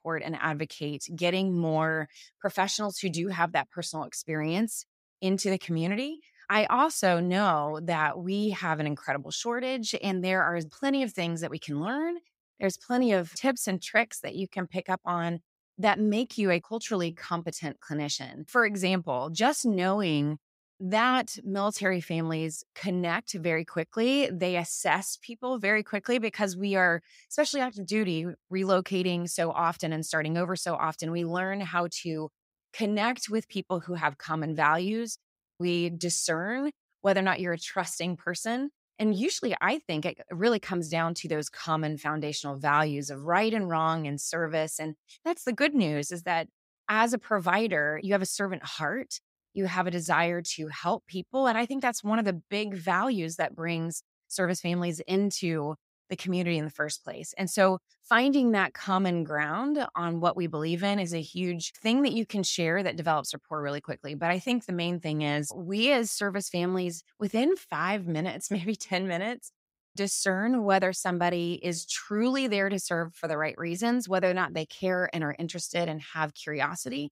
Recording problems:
none

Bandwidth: 15.5 kHz